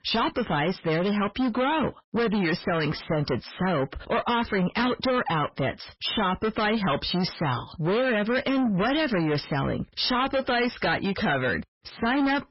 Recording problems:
distortion; heavy; 6 dB below the speech
garbled, watery; badly; nothing above 5.5 kHz

